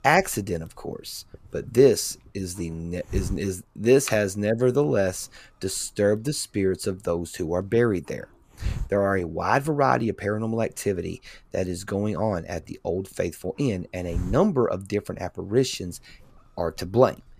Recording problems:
hiss; noticeable; throughout; 10 dB below the speech

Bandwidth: 14.5 kHz